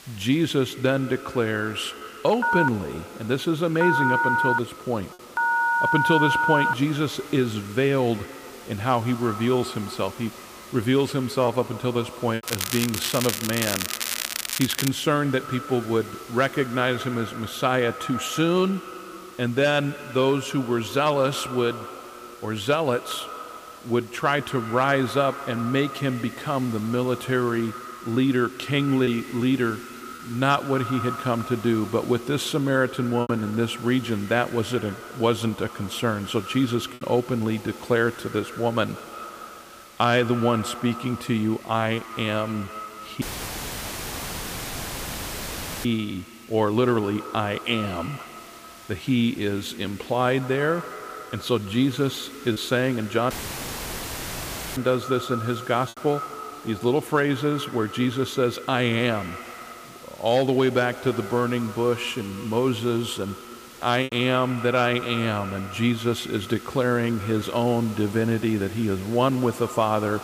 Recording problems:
echo of what is said; noticeable; throughout; 150 ms later, 15 dB below the speech
crackling; loud; from 12 to 15 s; 3 dB below the speech
hiss; faint; throughout; 20 dB below the speech
choppy; occasionally; 1% of the speech affected
phone ringing; loud; from 2.5 to 6.5 s; peak 4 dB above the speech
audio cutting out; filled with static; at 43 s for 2.5 s and at 53 s for 1.5 s

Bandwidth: 15 kHz